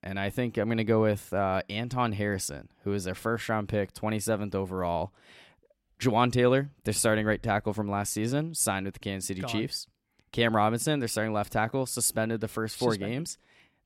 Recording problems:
none

